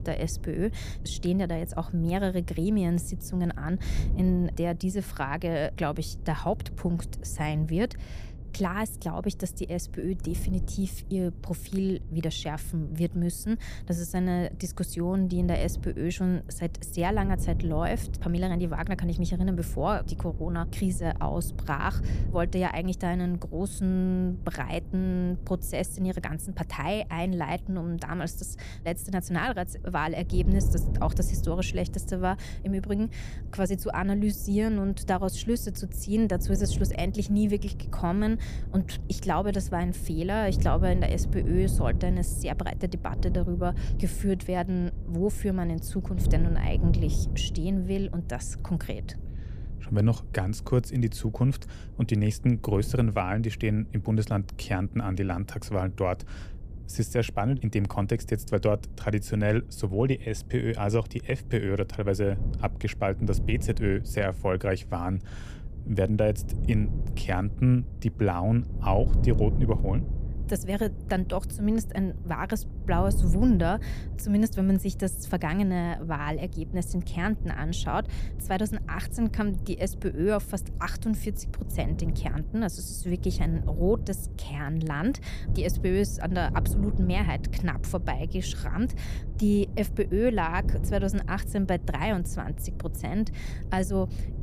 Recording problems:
wind noise on the microphone; occasional gusts; 15 dB below the speech

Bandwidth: 14.5 kHz